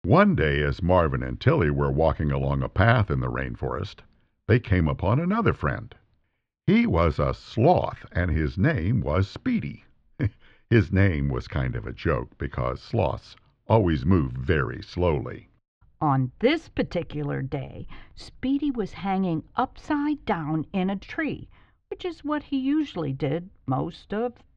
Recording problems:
muffled; slightly; fading above 3.5 kHz

